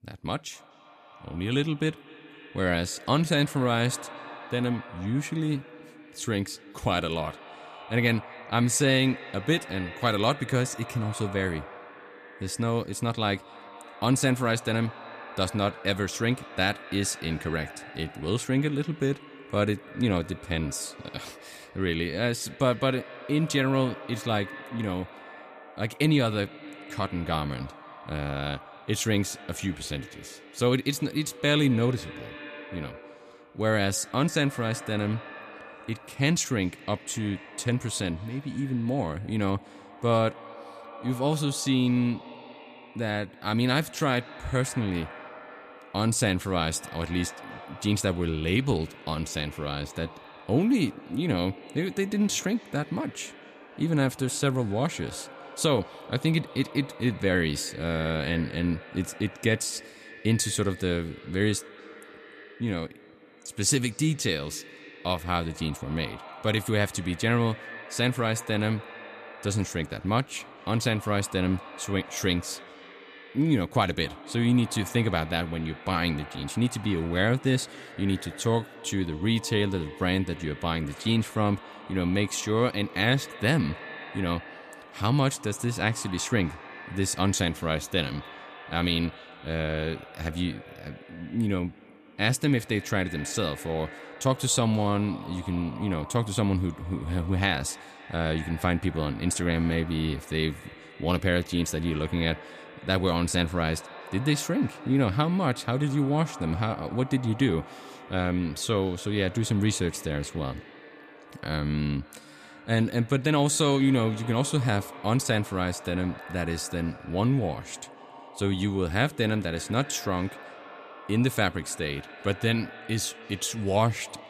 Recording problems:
echo of what is said; noticeable; throughout; 240 ms later, 15 dB below the speech

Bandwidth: 14.5 kHz